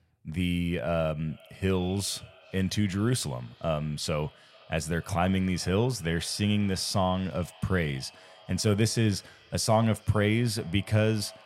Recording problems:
echo of what is said; faint; throughout; 410 ms later, 25 dB below the speech

